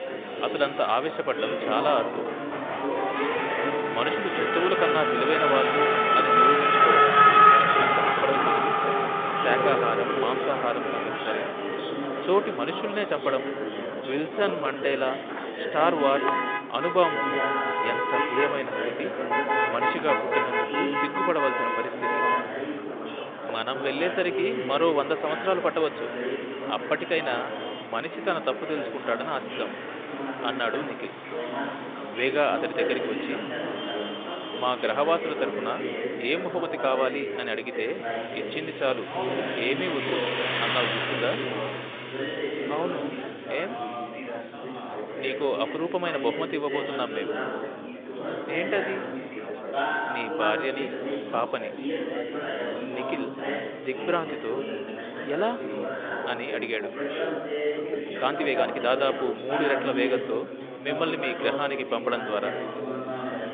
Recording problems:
phone-call audio; nothing above 3.5 kHz
traffic noise; very loud; throughout; 4 dB above the speech
chatter from many people; loud; throughout; 3 dB below the speech
uneven, jittery; strongly; from 7.5 to 59 s

